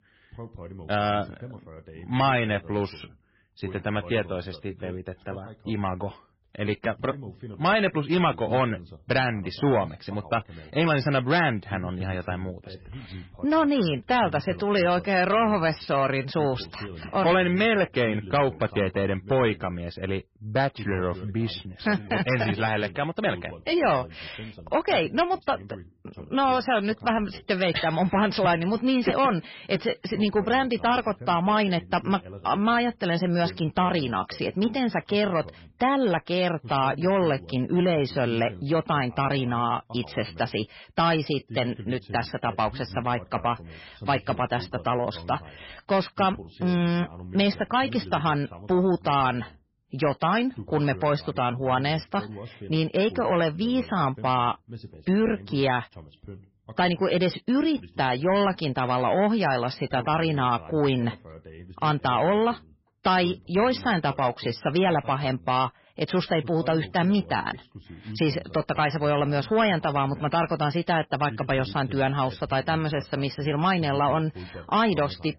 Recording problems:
garbled, watery; badly; nothing above 5.5 kHz
distortion; slight; 10 dB below the speech
voice in the background; noticeable; throughout; 20 dB below the speech

